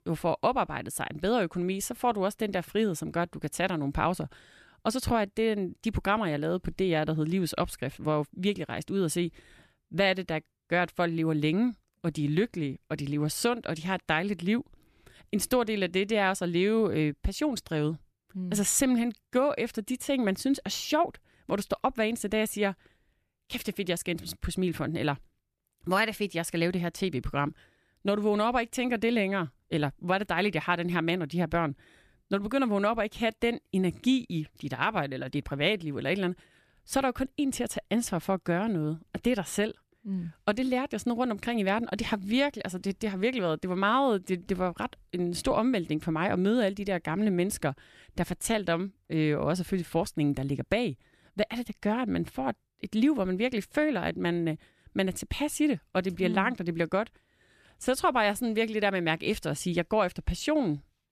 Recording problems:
none

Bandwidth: 14.5 kHz